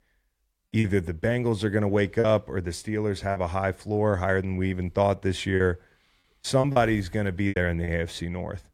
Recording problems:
choppy; very; 5% of the speech affected

